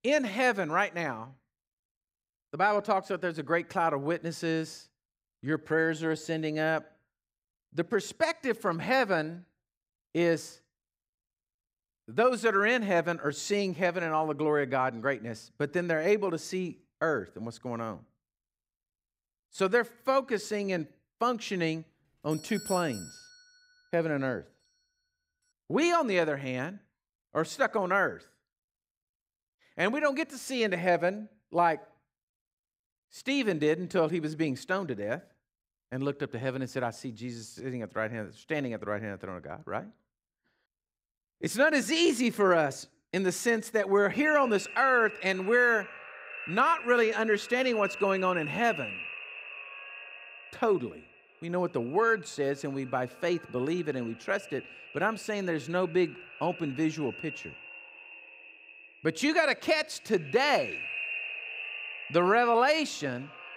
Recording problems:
echo of what is said; strong; from 44 s on; 320 ms later, 10 dB below the speech
doorbell; faint; from 22 to 23 s; peak 10 dB below the speech

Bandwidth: 15.5 kHz